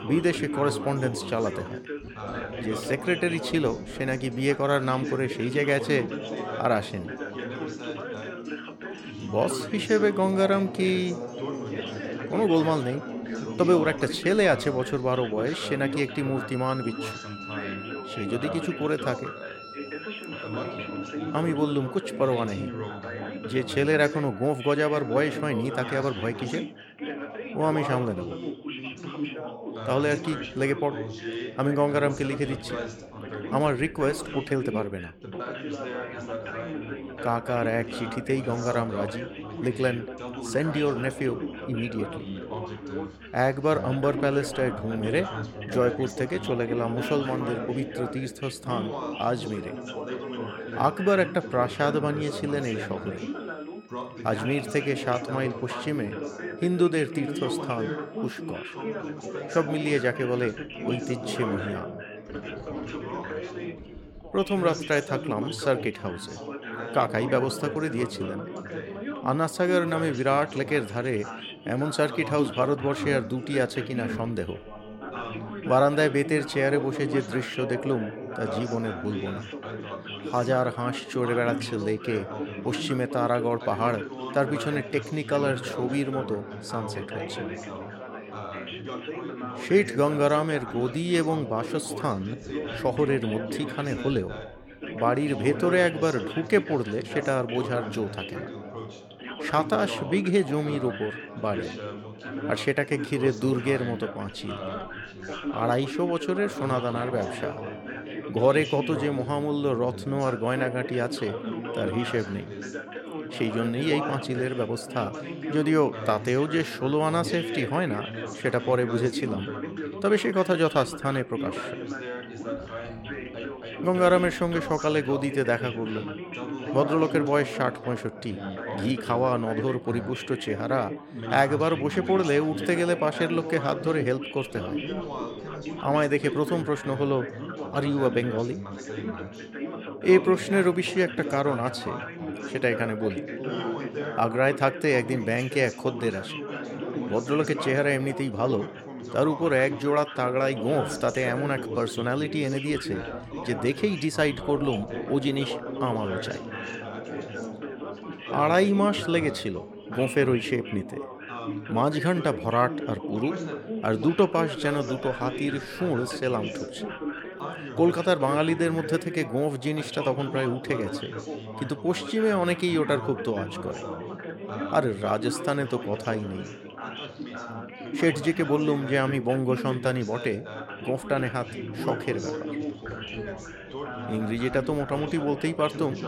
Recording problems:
background chatter; loud; throughout; 4 voices, 8 dB below the speech
background music; faint; throughout; 25 dB below the speech

